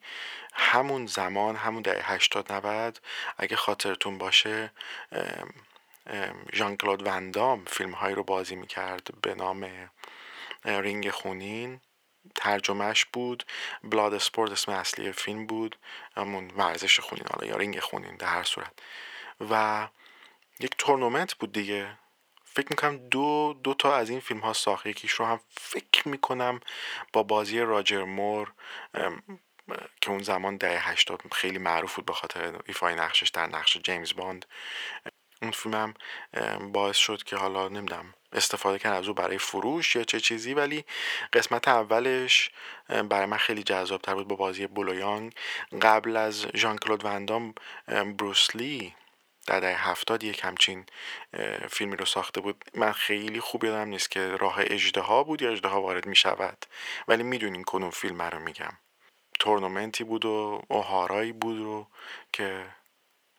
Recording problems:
thin; very; fading below 550 Hz

